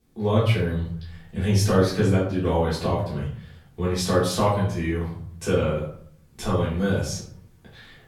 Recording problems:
off-mic speech; far
room echo; noticeable; dies away in 0.5 s

